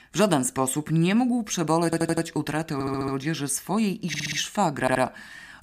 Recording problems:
audio stuttering; 4 times, first at 2 s

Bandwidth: 15 kHz